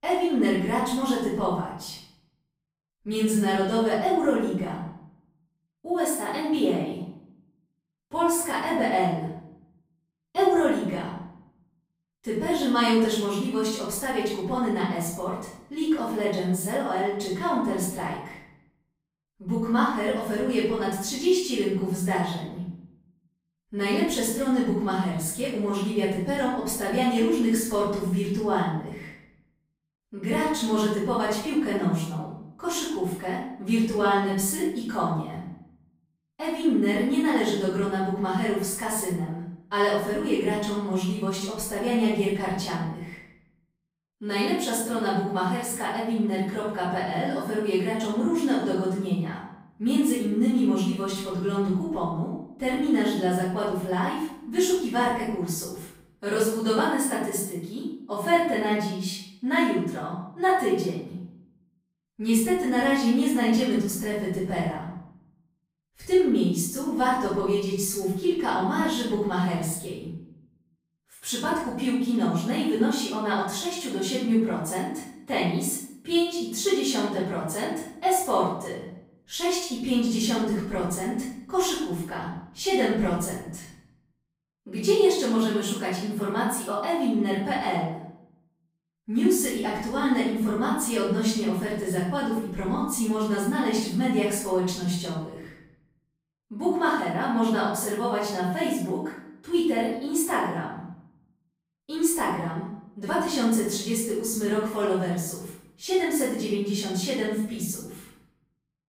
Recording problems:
off-mic speech; far
room echo; noticeable; dies away in 0.6 s

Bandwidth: 15.5 kHz